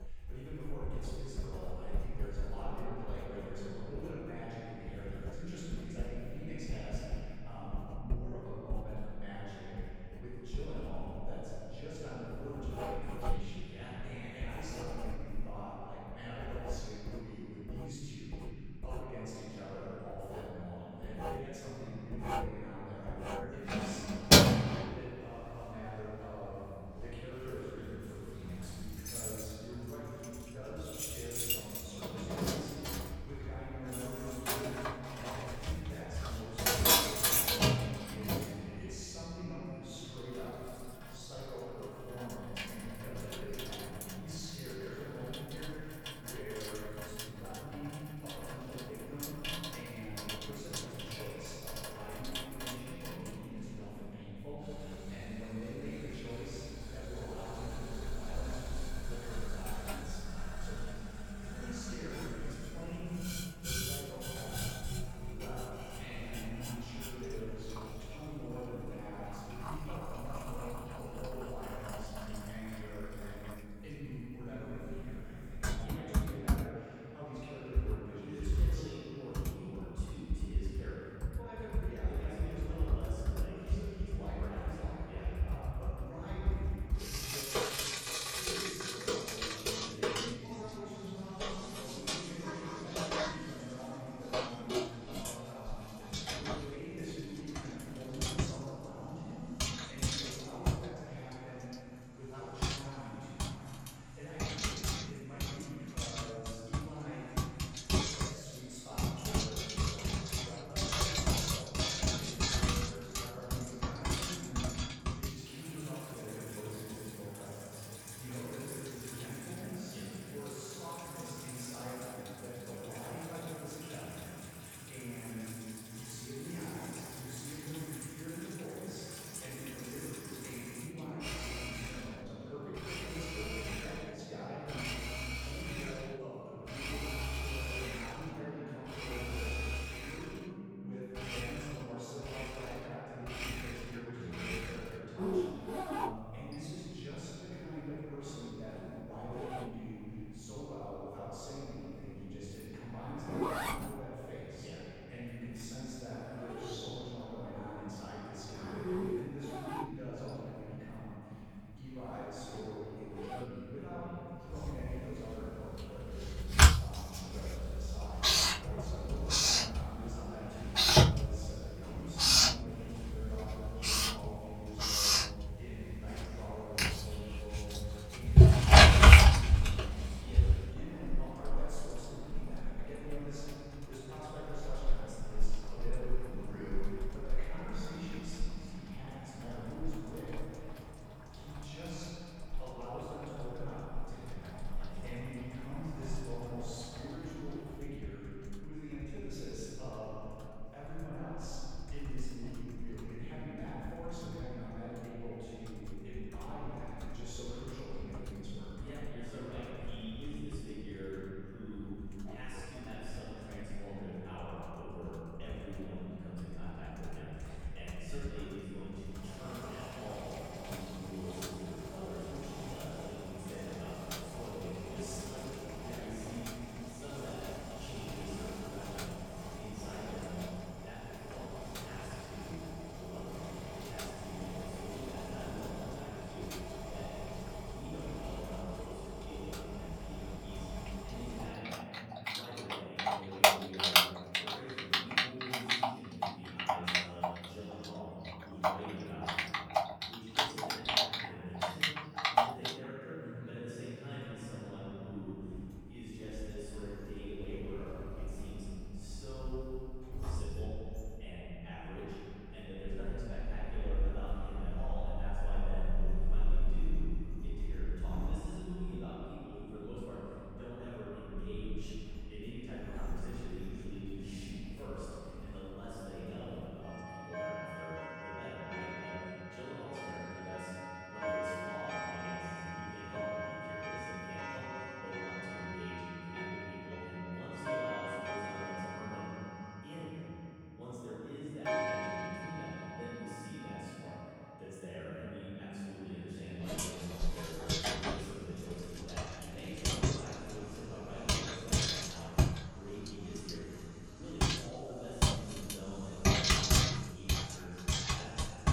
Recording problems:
room echo; strong; dies away in 3 s
off-mic speech; far
household noises; very loud; throughout; 10 dB above the speech

